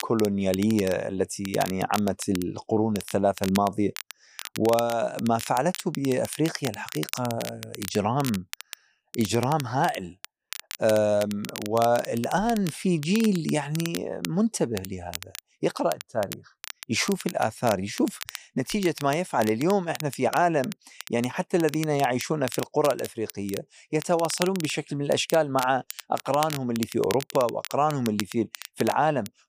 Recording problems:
crackle, like an old record; noticeable; 10 dB below the speech

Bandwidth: 15 kHz